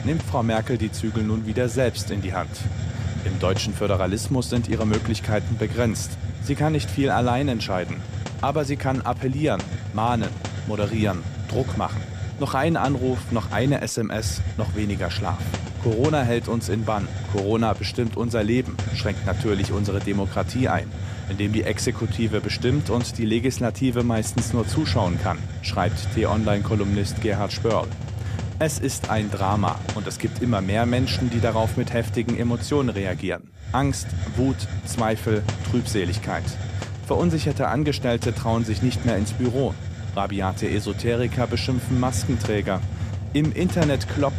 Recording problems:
hiss; loud; throughout; 5 dB below the speech

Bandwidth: 14.5 kHz